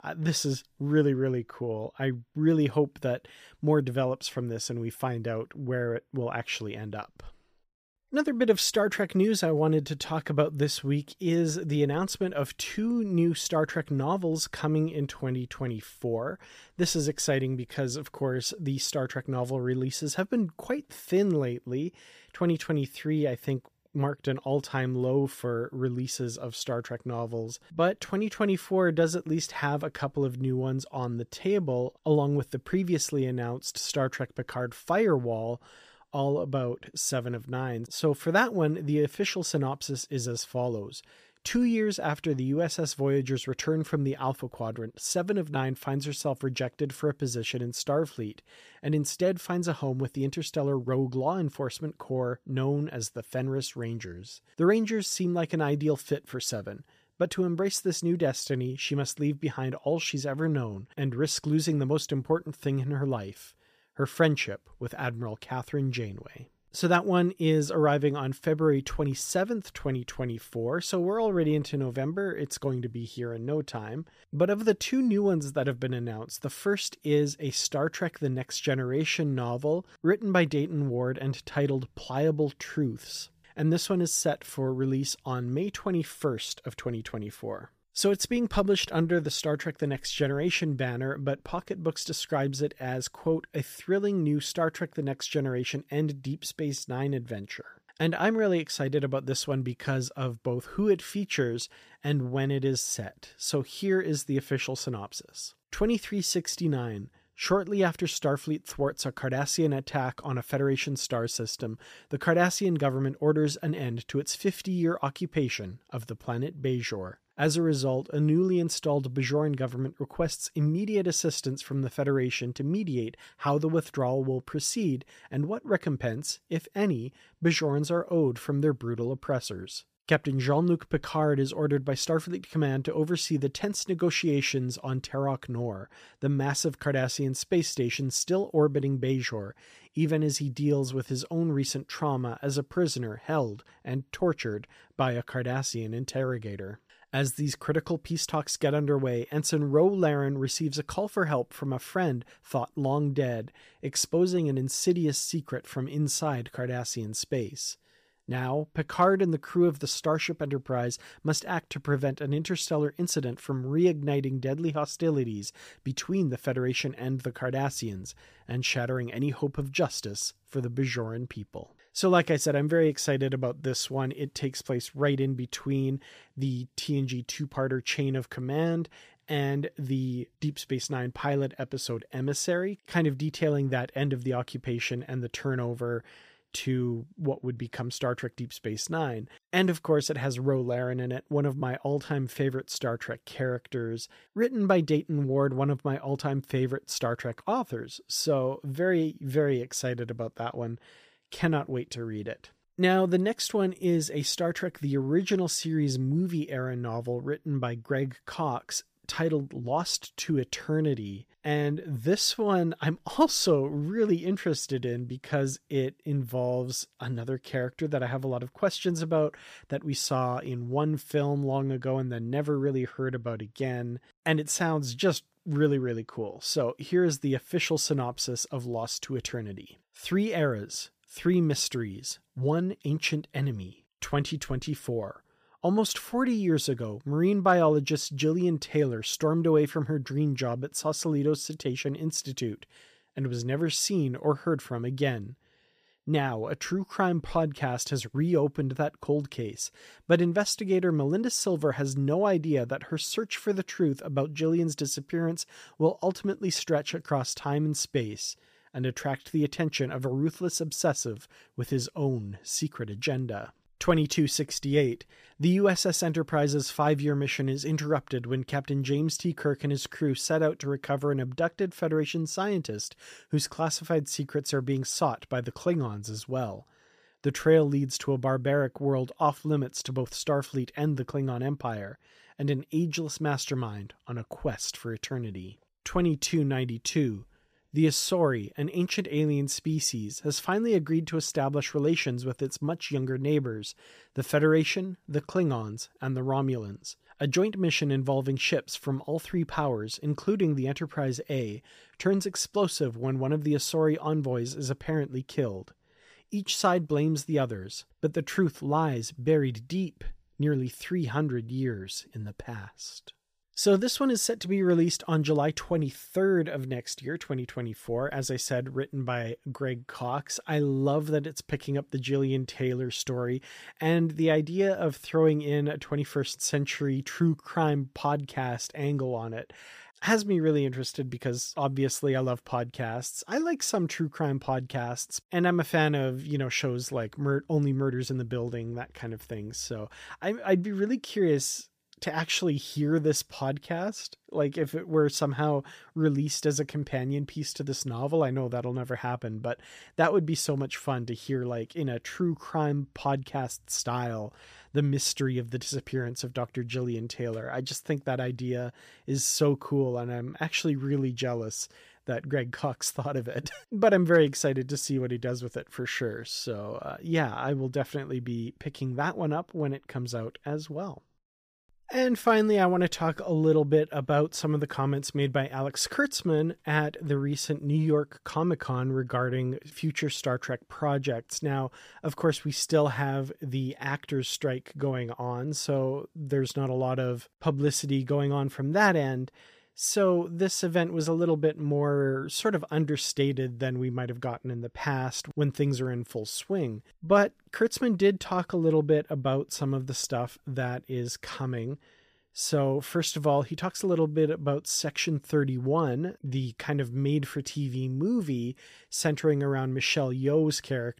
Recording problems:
none

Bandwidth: 15 kHz